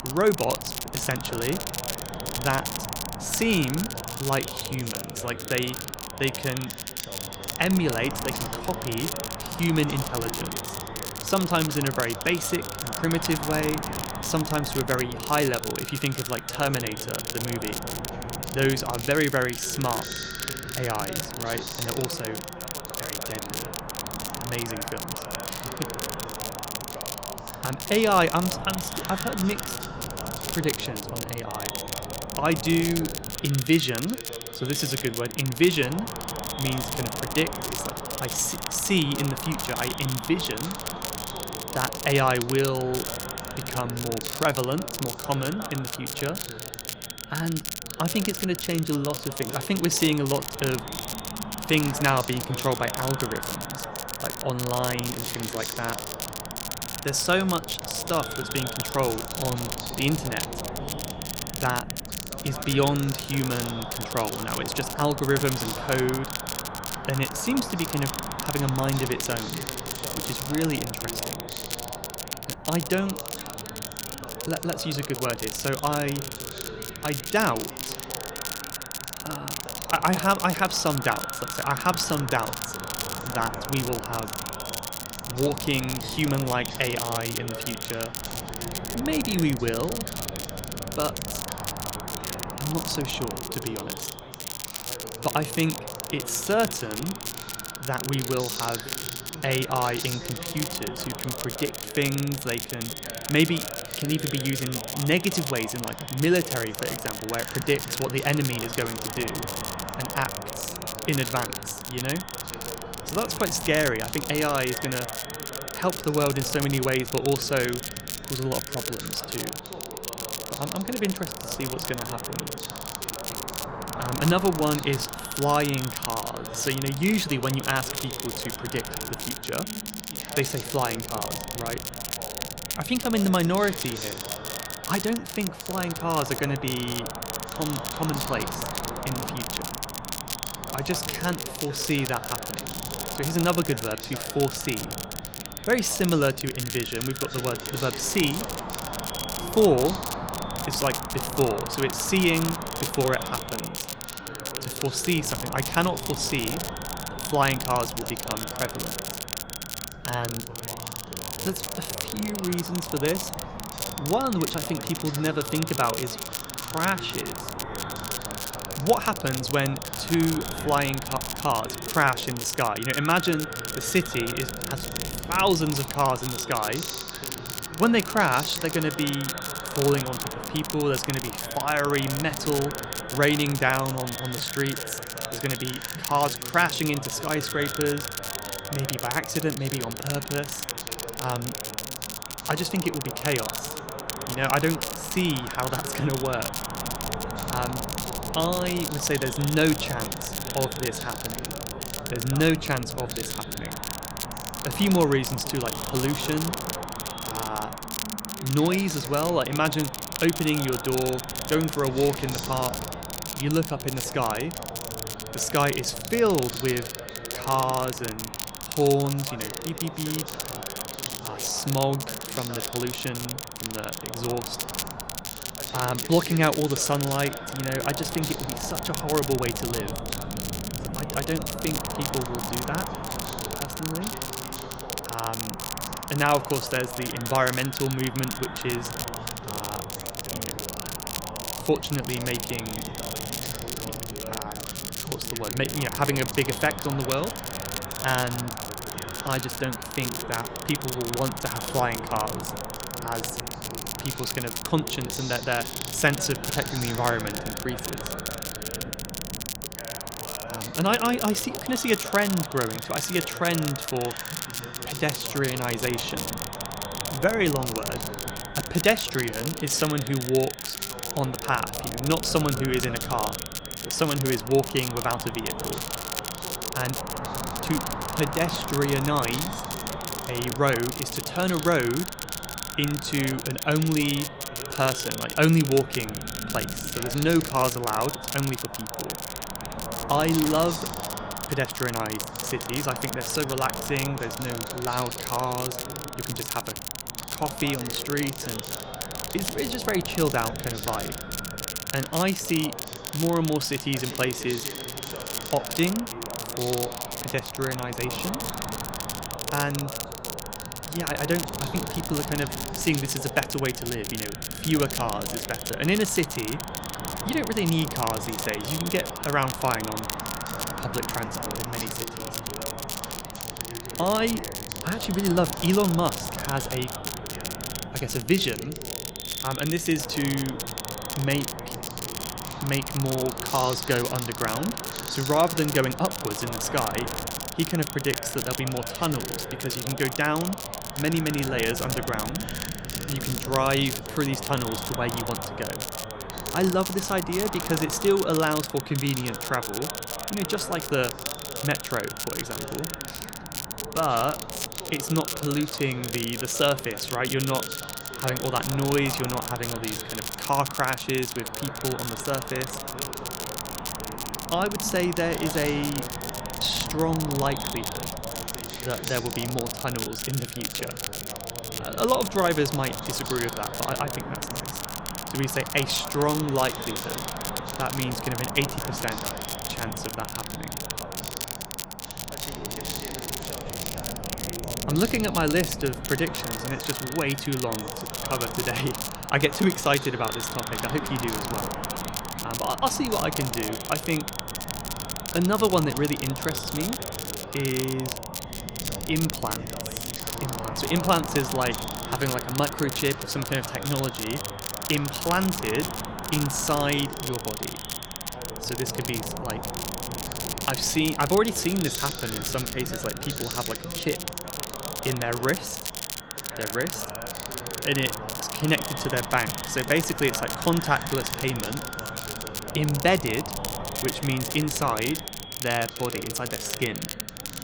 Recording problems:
echo of what is said; noticeable; throughout; 250 ms later, 20 dB below the speech
crackle, like an old record; loud; 6 dB below the speech
background chatter; noticeable; throughout; 2 voices, 15 dB below the speech
wind noise on the microphone; occasional gusts; 10 dB below the speech

